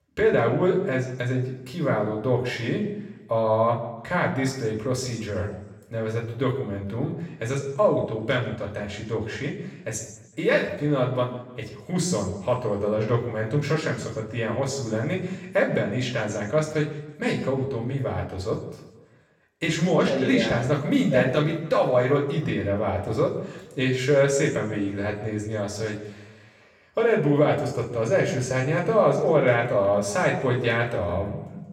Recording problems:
off-mic speech; far
room echo; slight; dies away in 0.9 s

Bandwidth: 17 kHz